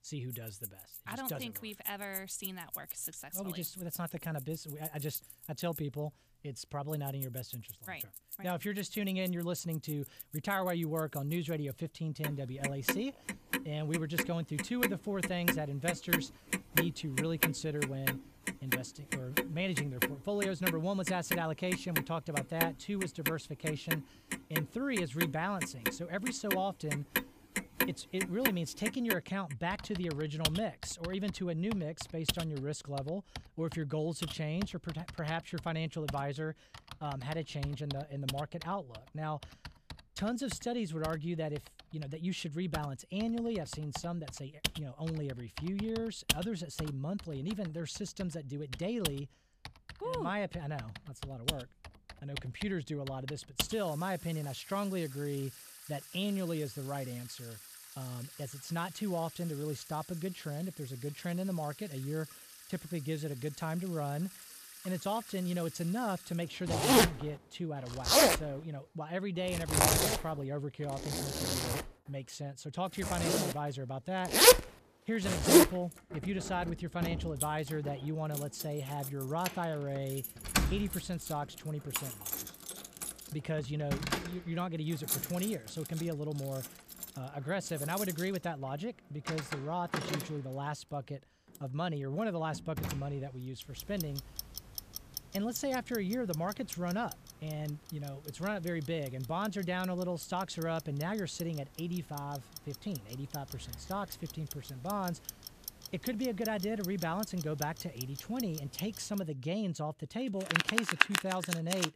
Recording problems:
household noises; very loud; throughout; 3 dB above the speech

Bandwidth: 14.5 kHz